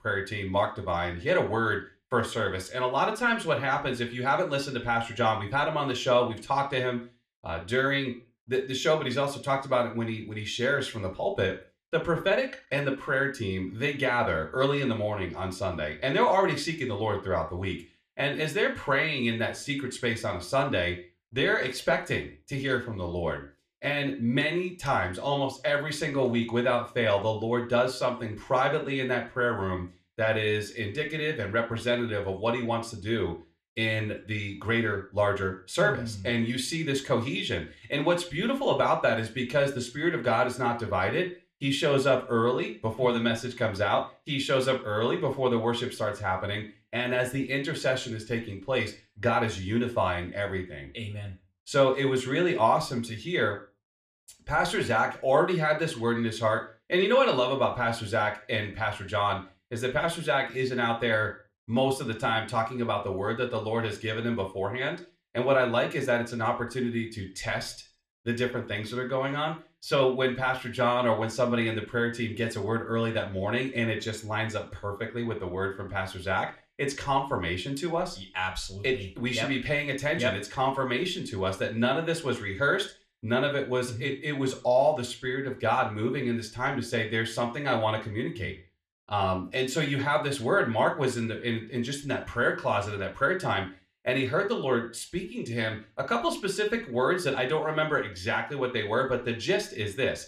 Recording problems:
room echo; slight; dies away in 0.3 s
off-mic speech; somewhat distant

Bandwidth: 14 kHz